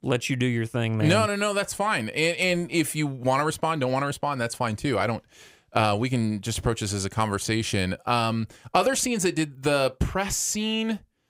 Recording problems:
none

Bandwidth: 15.5 kHz